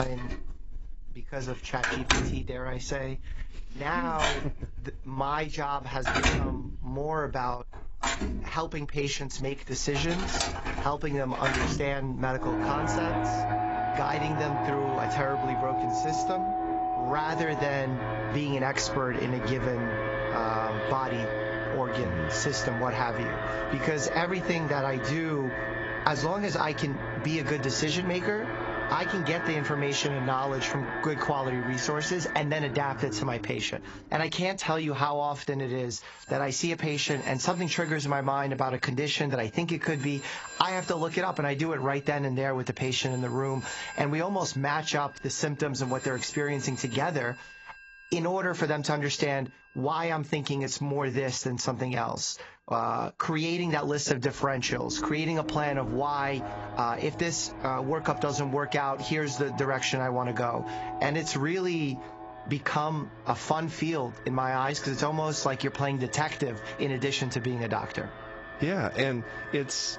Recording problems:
garbled, watery; badly; nothing above 7.5 kHz
squashed, flat; somewhat, background pumping
alarms or sirens; loud; throughout; 4 dB below the speech
abrupt cut into speech; at the start

